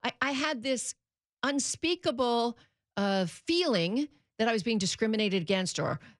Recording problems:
none

